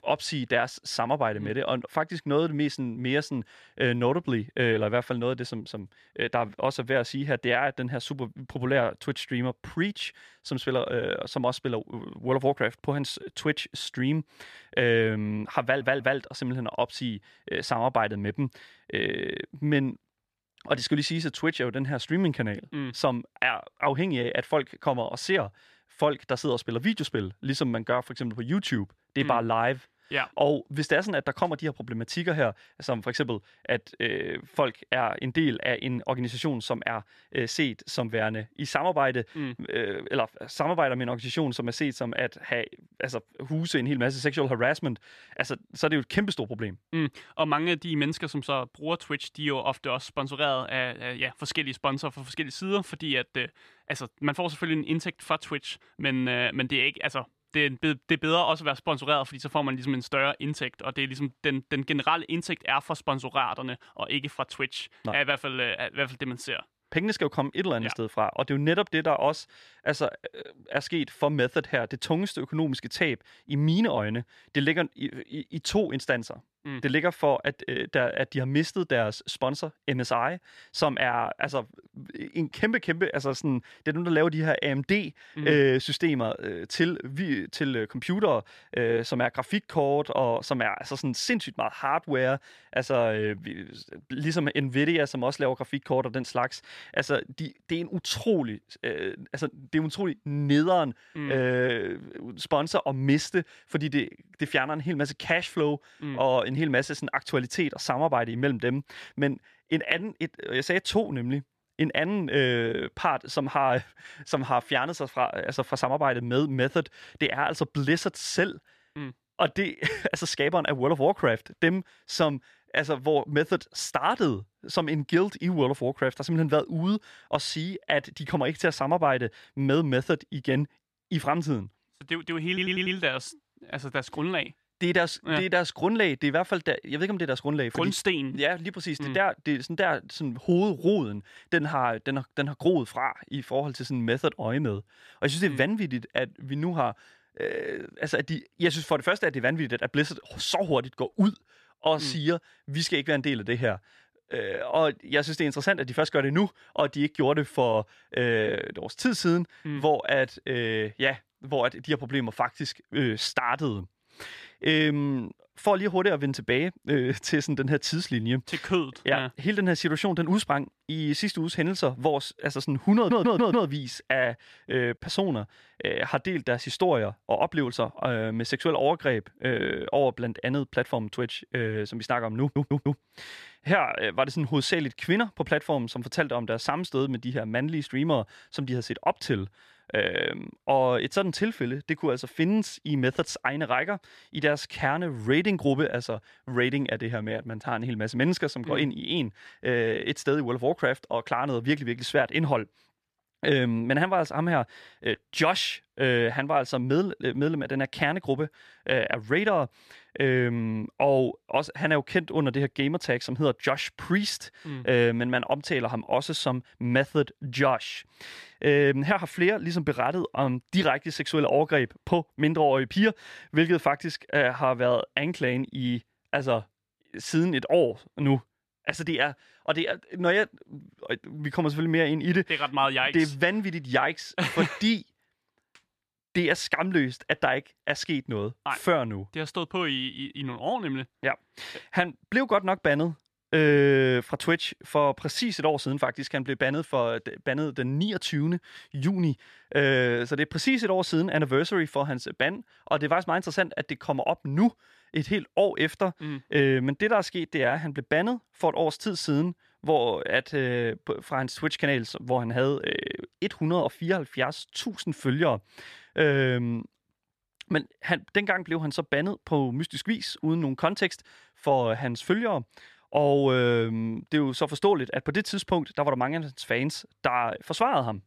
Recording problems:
audio stuttering; 4 times, first at 16 s

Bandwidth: 14 kHz